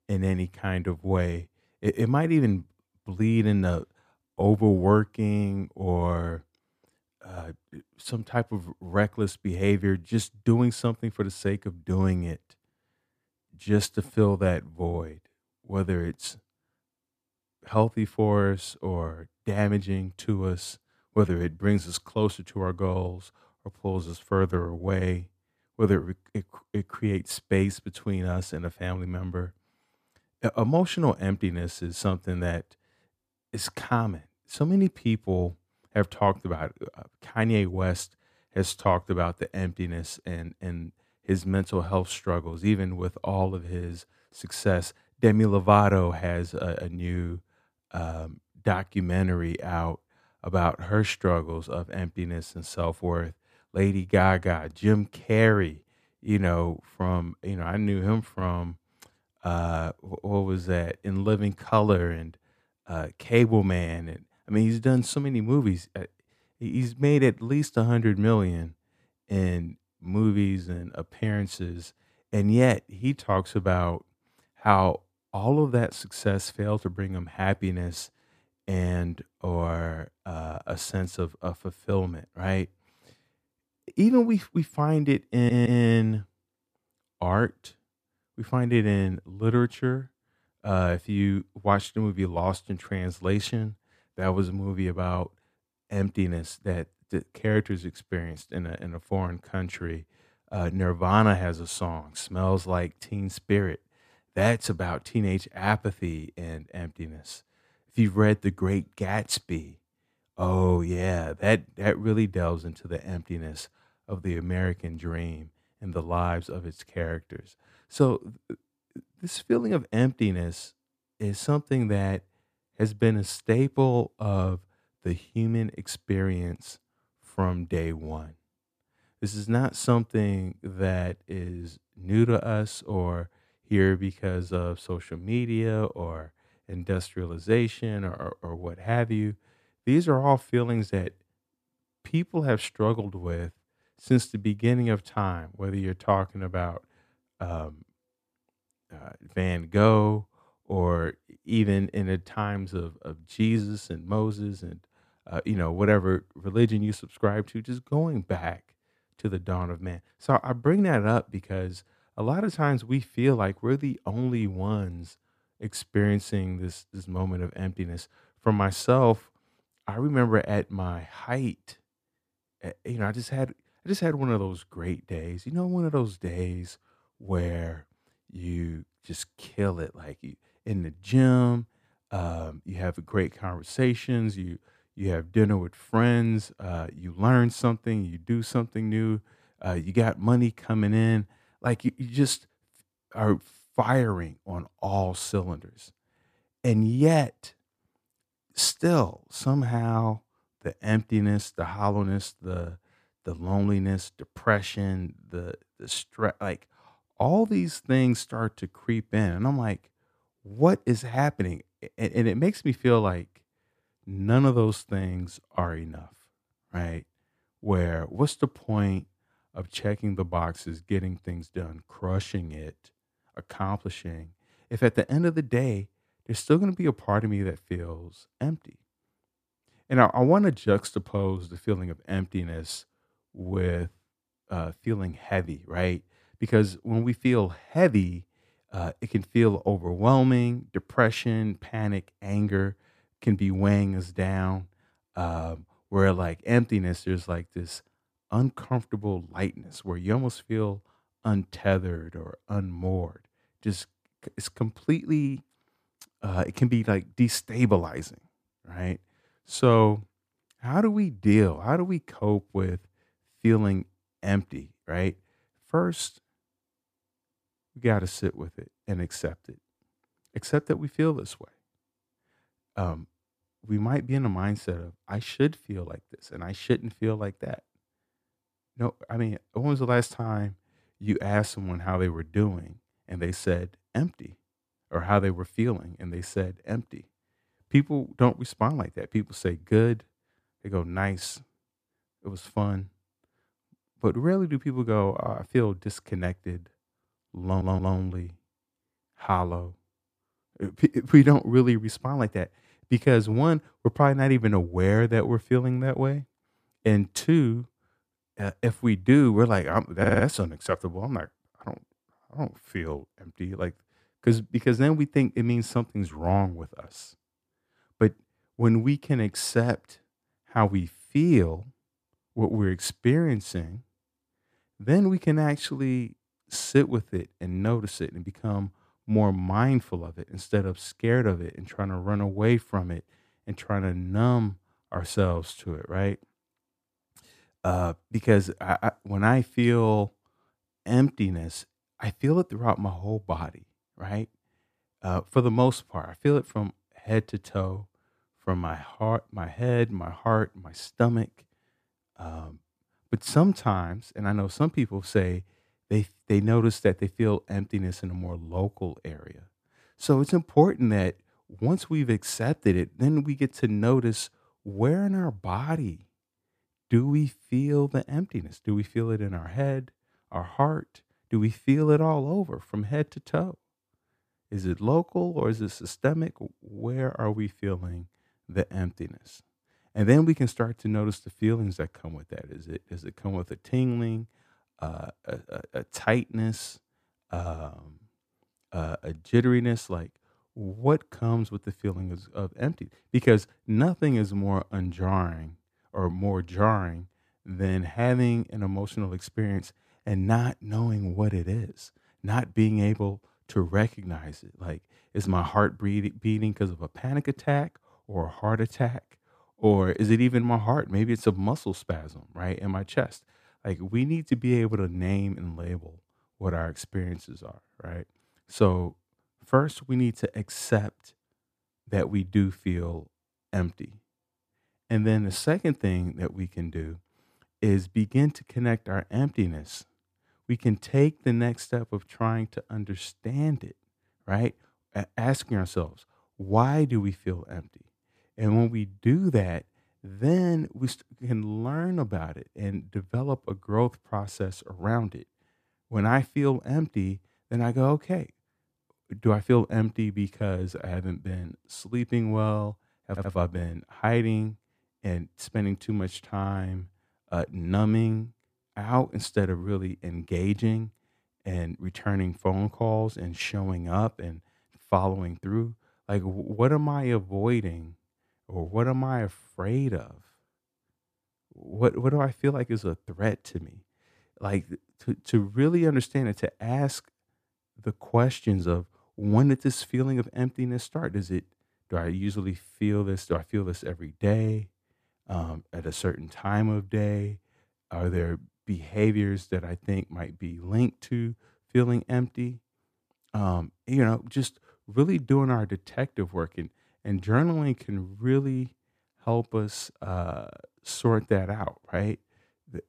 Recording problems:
audio stuttering; 4 times, first at 1:25

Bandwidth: 14.5 kHz